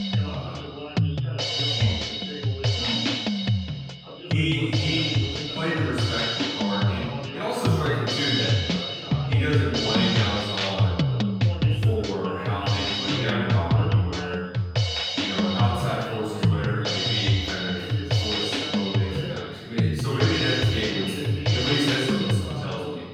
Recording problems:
room echo; strong; dies away in 1.4 s
off-mic speech; far
background music; very loud; throughout; 4 dB above the speech
voice in the background; loud; throughout; 9 dB below the speech
high-pitched whine; faint; throughout; 5 kHz, 30 dB below the speech

